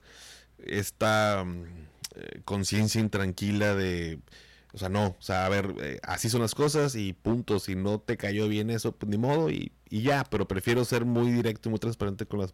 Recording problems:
distortion; slight; 6% of the sound clipped

